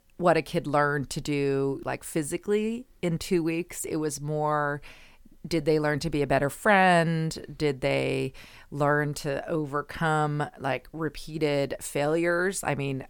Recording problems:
none

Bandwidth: 18 kHz